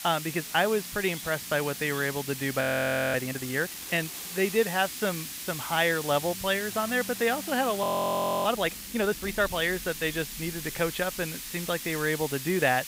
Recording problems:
muffled; slightly; fading above 2.5 kHz
hiss; loud; throughout; 8 dB below the speech
electrical hum; faint; throughout; 50 Hz, 30 dB below the speech
rain or running water; faint; throughout; 20 dB below the speech
audio freezing; at 2.5 s for 0.5 s and at 8 s for 0.5 s

